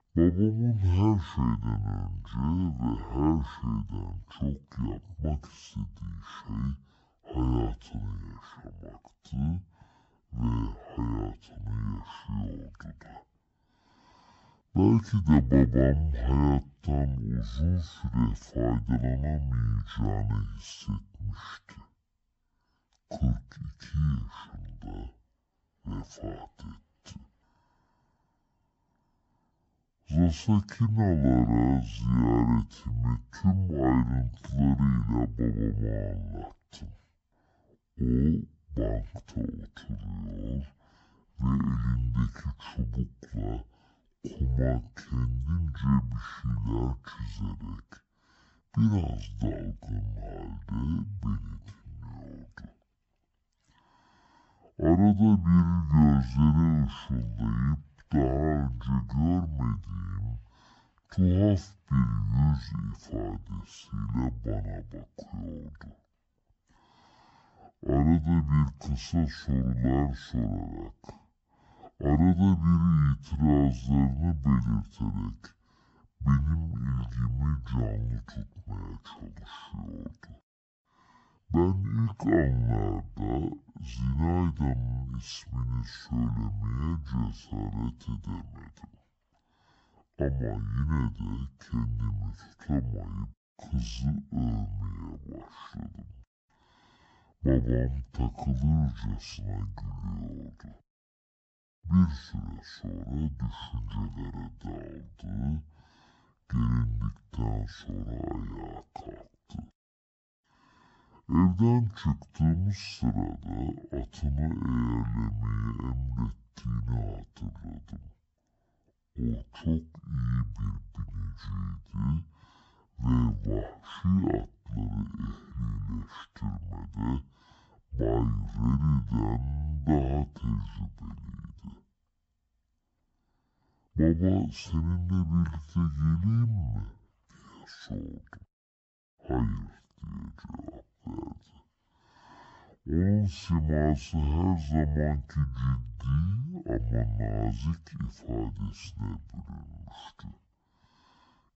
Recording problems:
wrong speed and pitch; too slow and too low; 0.5 times normal speed

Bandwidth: 8 kHz